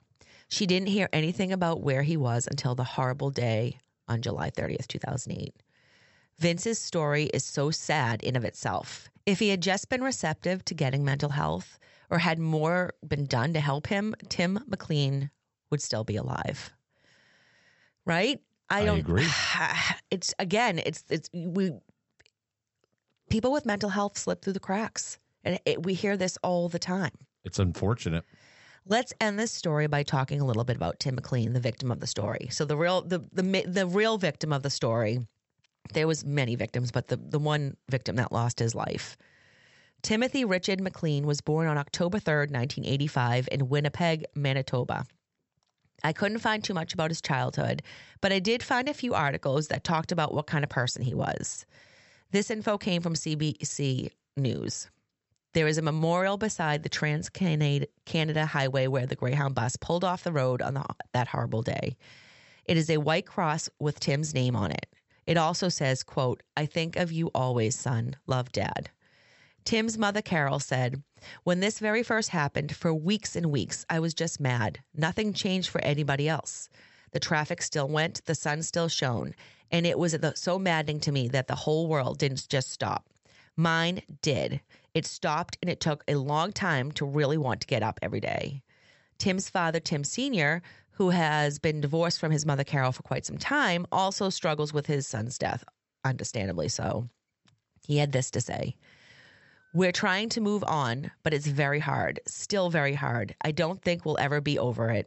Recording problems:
high frequencies cut off; noticeable; nothing above 8 kHz

